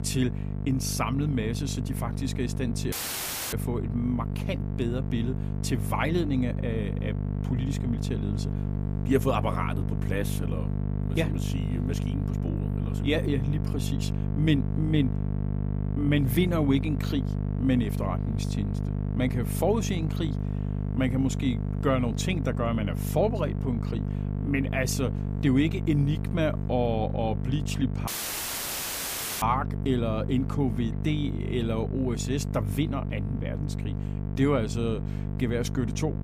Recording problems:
electrical hum; loud; throughout; 50 Hz, 8 dB below the speech
audio cutting out; at 3 s for 0.5 s and at 28 s for 1.5 s

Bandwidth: 15 kHz